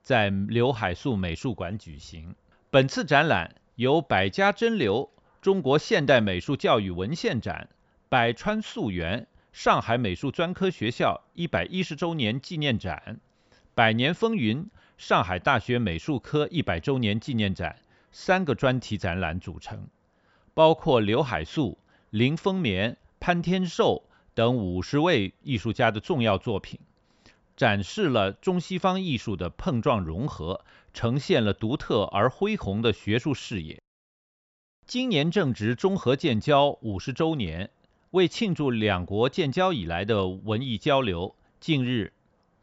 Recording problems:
high frequencies cut off; noticeable; nothing above 8 kHz

